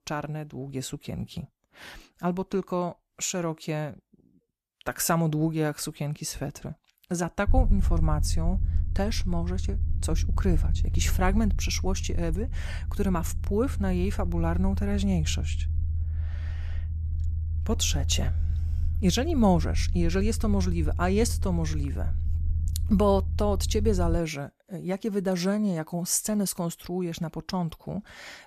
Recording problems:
low rumble; noticeable; from 7.5 to 24 s; 15 dB below the speech

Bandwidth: 14.5 kHz